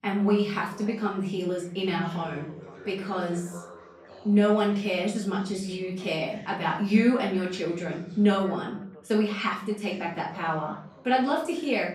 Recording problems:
off-mic speech; far
room echo; slight; dies away in 0.4 s
background chatter; faint; throughout; 2 voices, 20 dB below the speech

